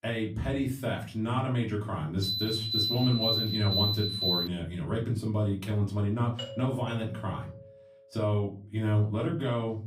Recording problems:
off-mic speech; far
room echo; very slight; dies away in 0.3 s
alarm; loud; from 2 to 4.5 s; peak 4 dB above the speech
doorbell; noticeable; from 6.5 to 8 s; peak 8 dB below the speech

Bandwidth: 15.5 kHz